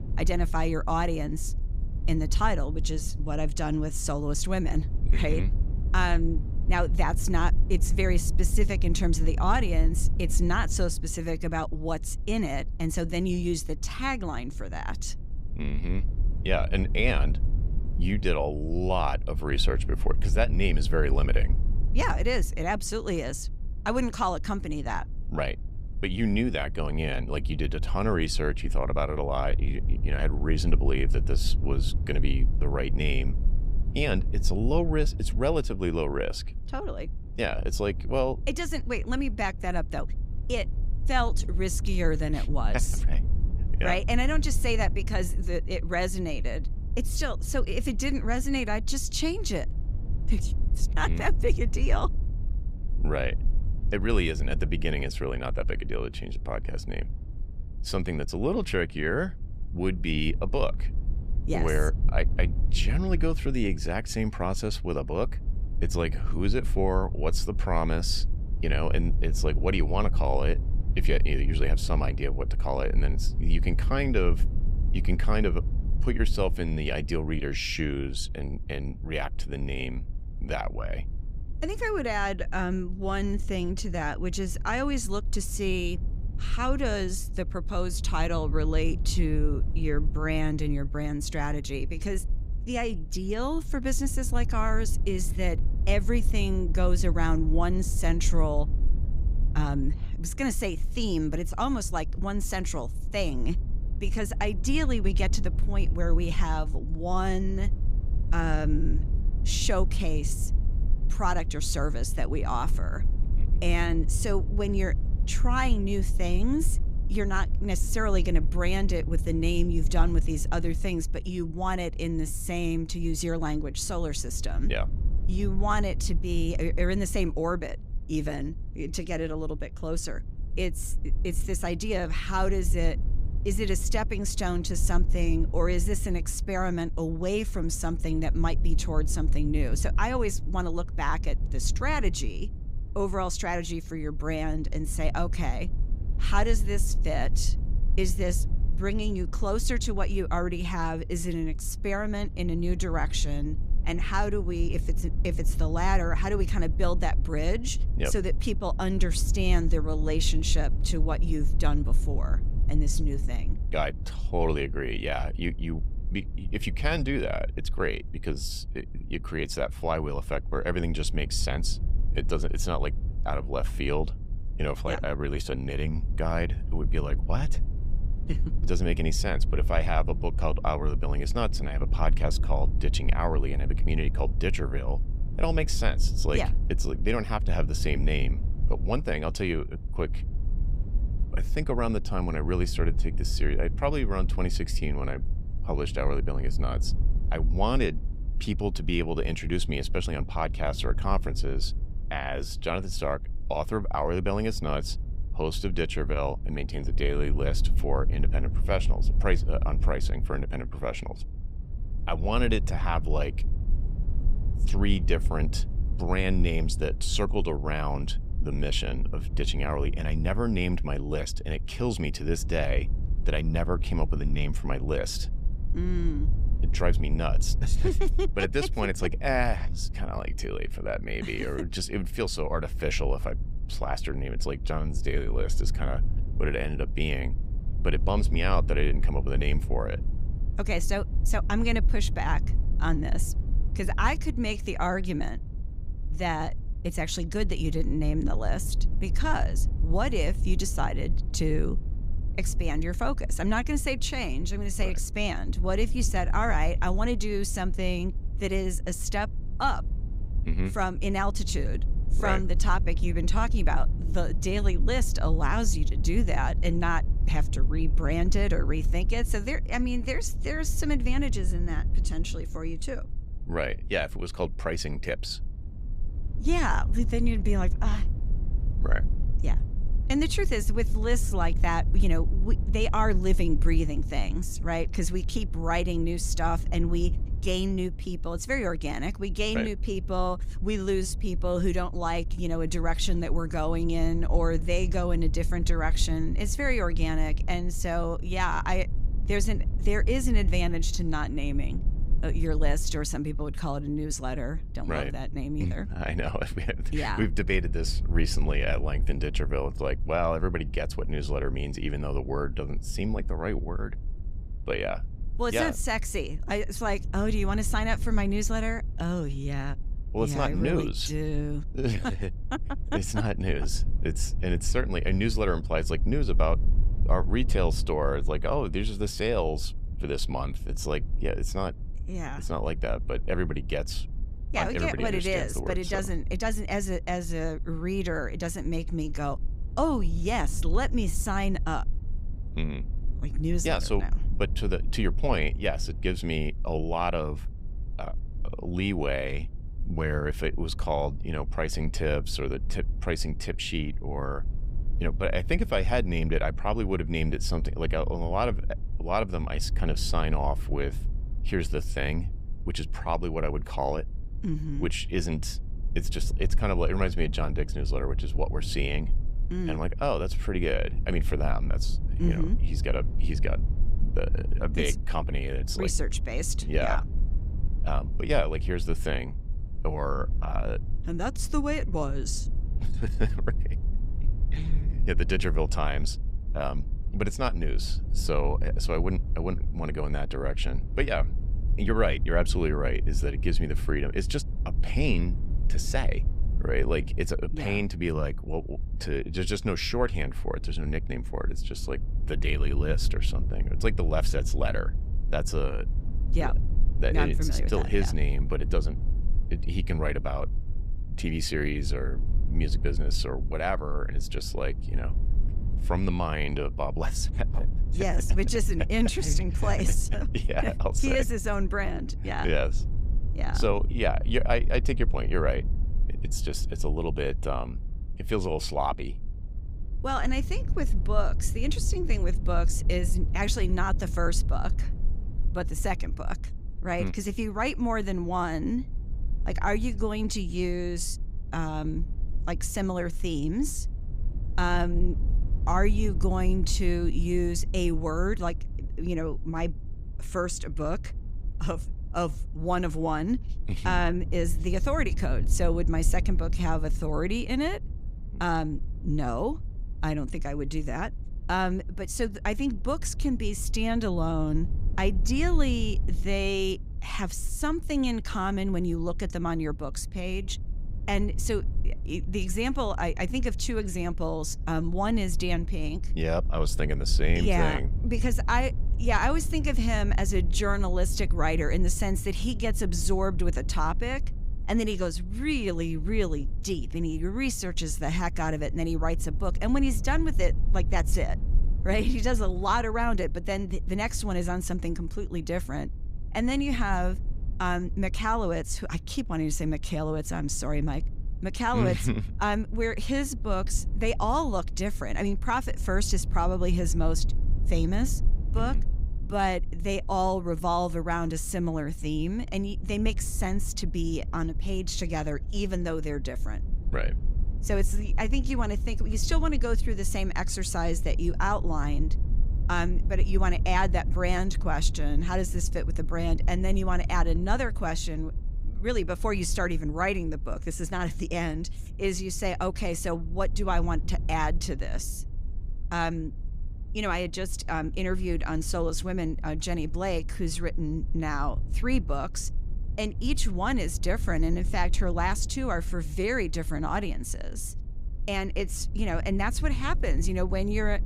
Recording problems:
low rumble; noticeable; throughout; 20 dB below the speech

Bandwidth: 15.5 kHz